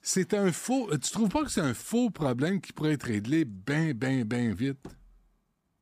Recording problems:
none

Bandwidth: 15 kHz